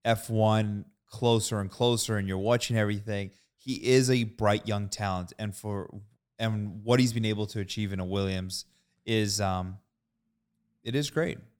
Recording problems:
none

